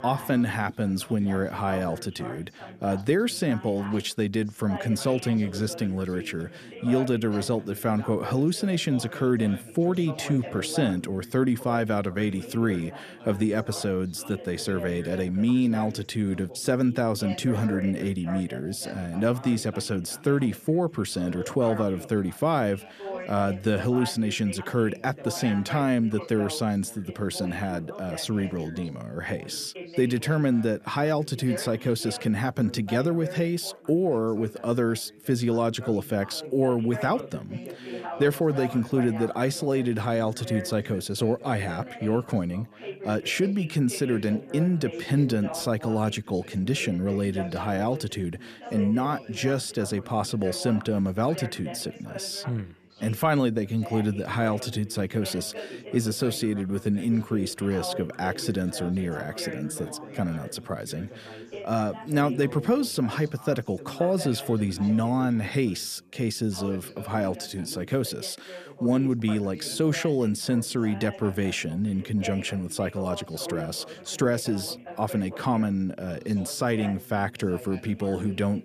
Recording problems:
background chatter; noticeable; throughout; 3 voices, 15 dB below the speech

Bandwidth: 14.5 kHz